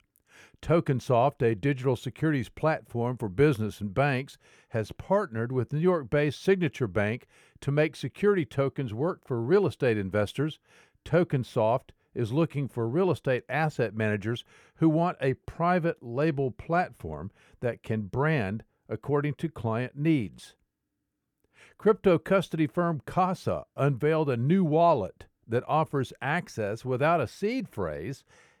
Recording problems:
none

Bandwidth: 18.5 kHz